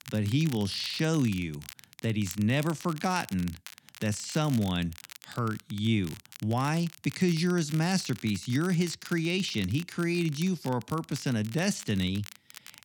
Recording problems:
crackle, like an old record; noticeable; 15 dB below the speech

